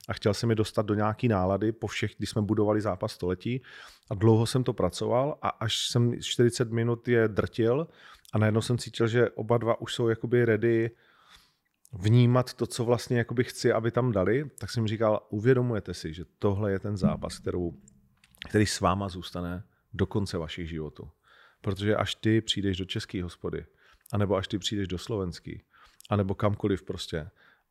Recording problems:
none

